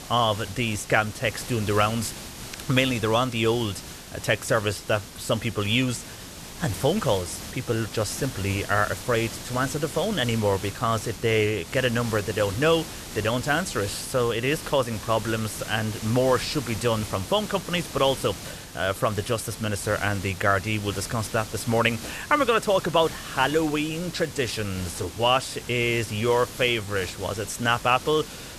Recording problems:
hiss; noticeable; throughout; 10 dB below the speech

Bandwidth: 14 kHz